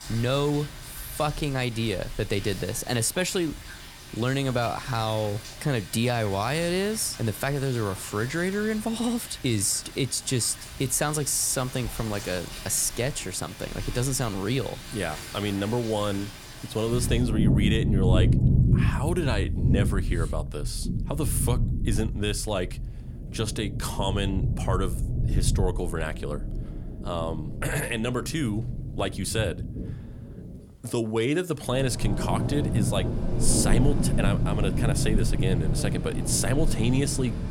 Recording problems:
rain or running water; loud; throughout; 2 dB below the speech

